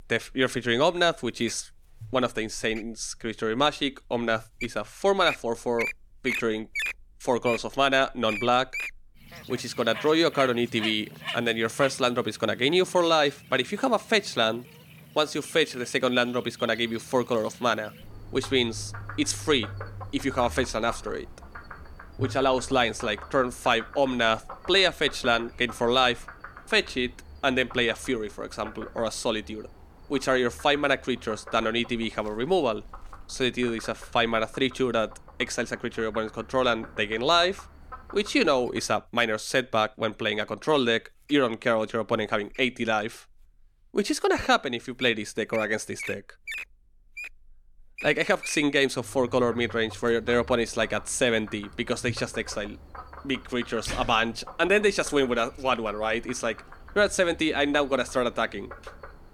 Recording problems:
animal sounds; noticeable; throughout; 15 dB below the speech

